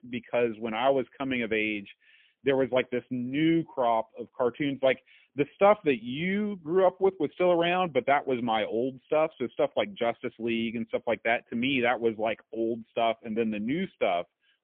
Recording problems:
phone-call audio; poor line; nothing above 3.5 kHz

